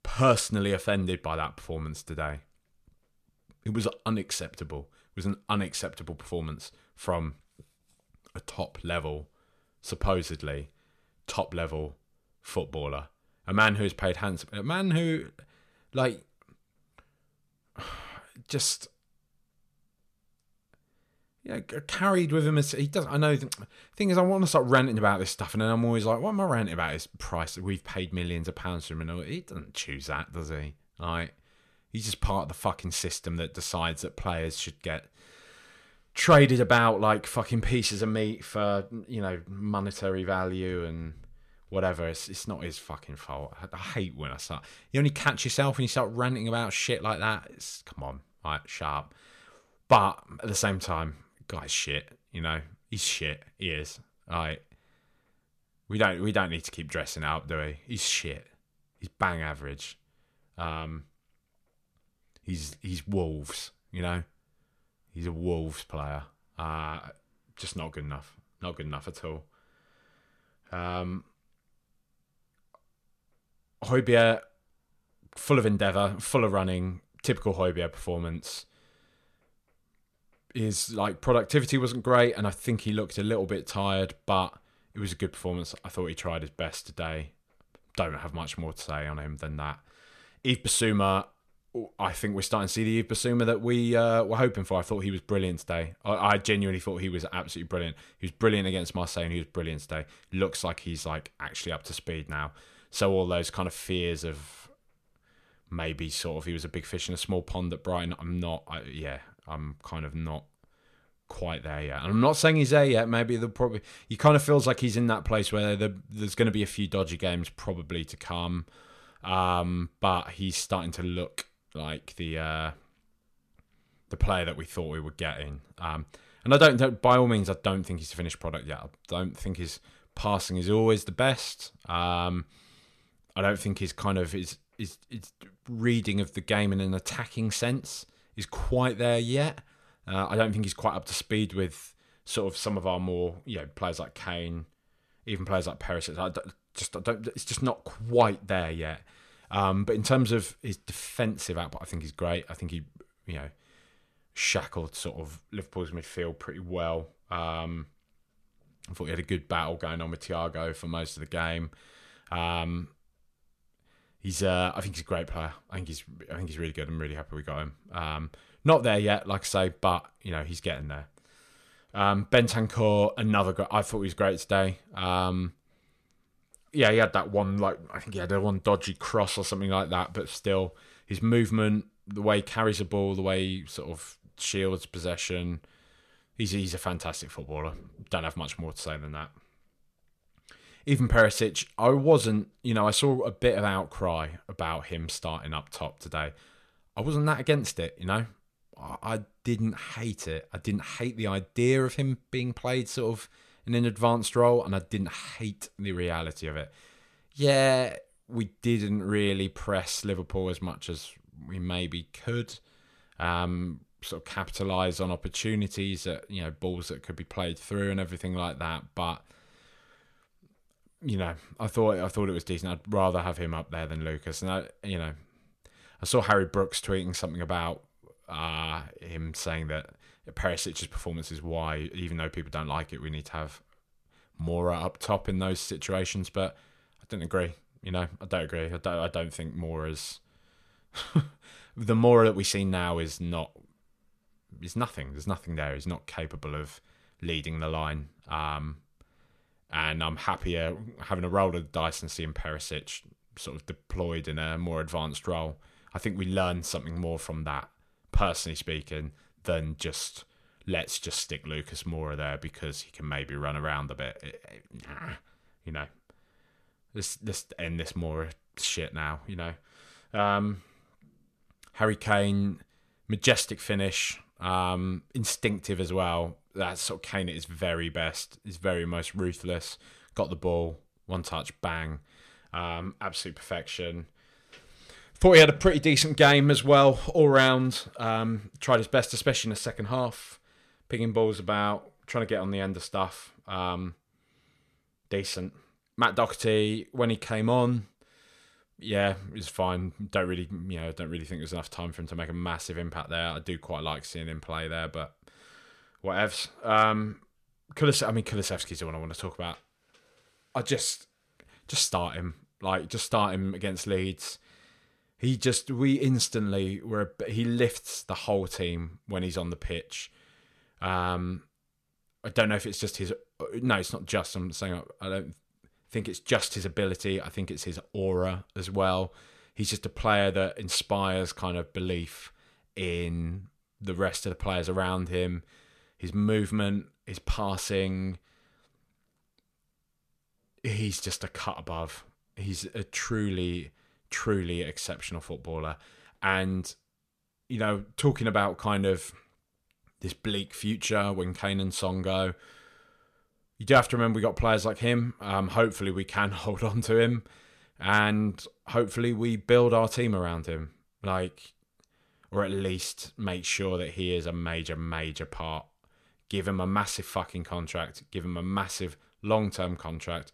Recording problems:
none

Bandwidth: 14.5 kHz